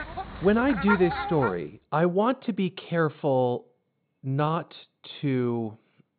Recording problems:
high frequencies cut off; severe; nothing above 4 kHz
animal sounds; loud; until 1.5 s; 5 dB below the speech

